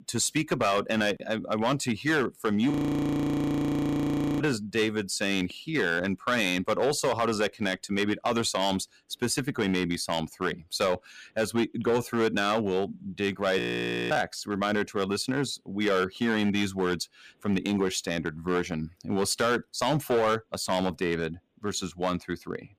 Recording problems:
distortion; slight; 6% of the sound clipped
audio freezing; at 2.5 s for 1.5 s and at 14 s for 0.5 s

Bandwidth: 15 kHz